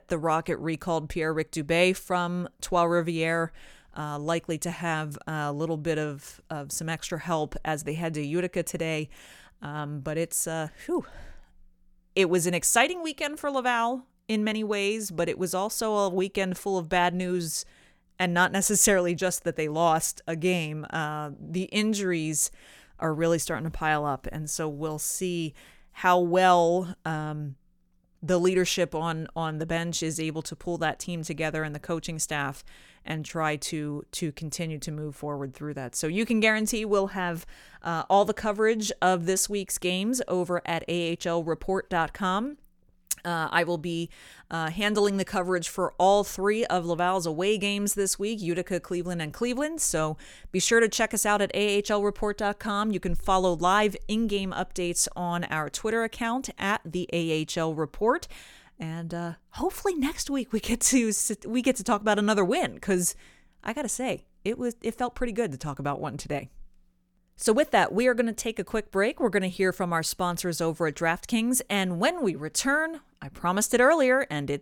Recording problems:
none

